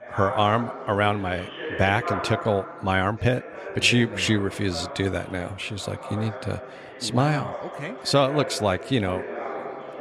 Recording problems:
chatter from many people; noticeable; throughout; 10 dB below the speech

